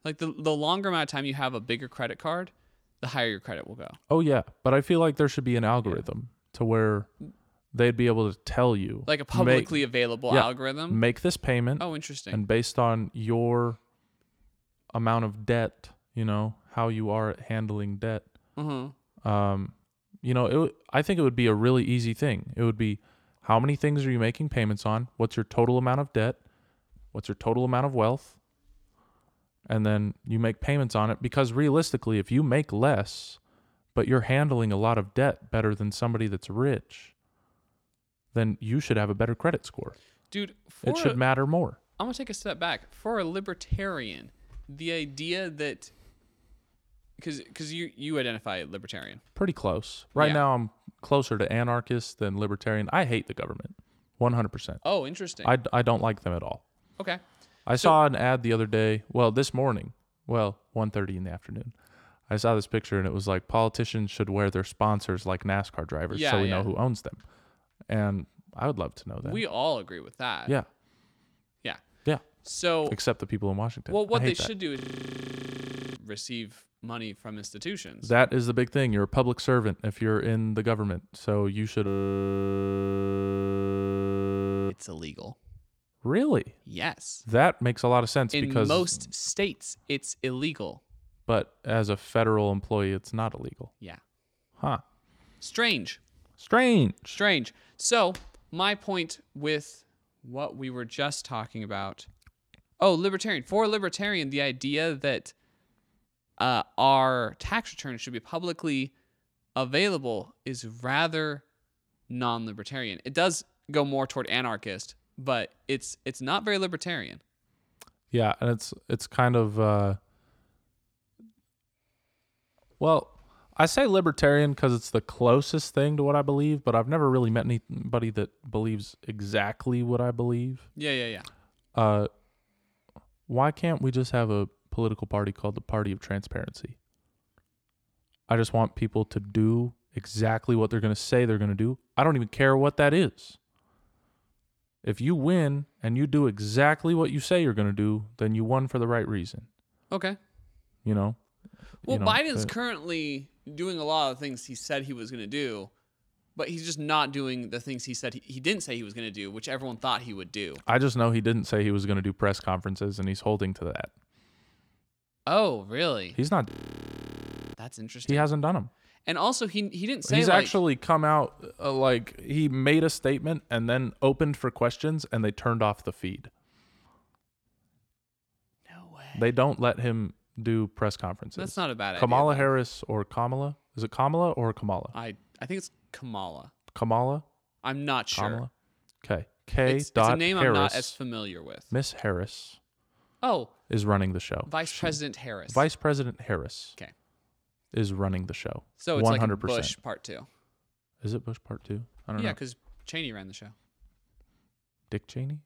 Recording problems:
audio freezing; at 1:15 for 1 s, at 1:22 for 3 s and at 2:46 for 1 s

